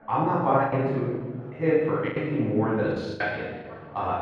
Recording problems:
room echo; strong; dies away in 1.4 s
off-mic speech; far
muffled; very; fading above 1.5 kHz
chatter from many people; faint; throughout; 20 dB below the speech
choppy; very; 9% of the speech affected

